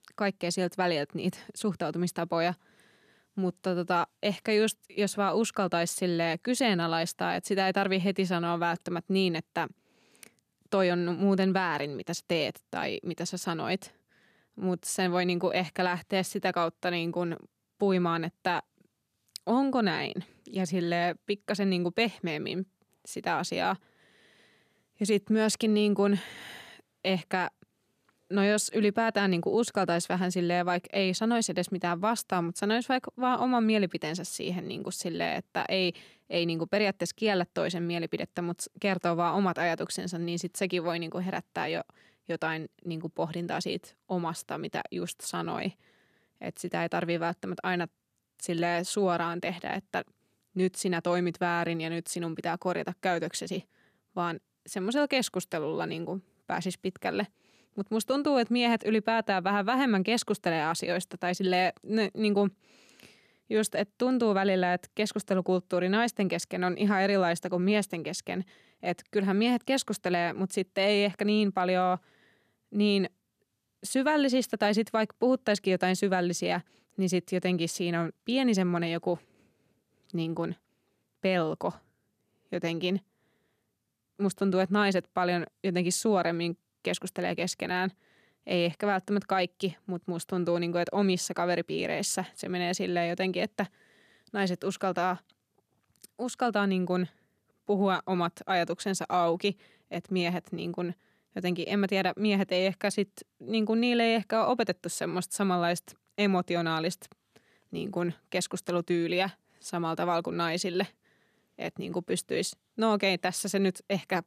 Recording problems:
none

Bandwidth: 14.5 kHz